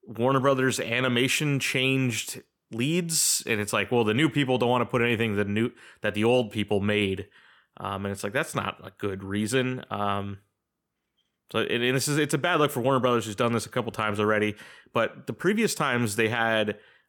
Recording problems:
none

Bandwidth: 18 kHz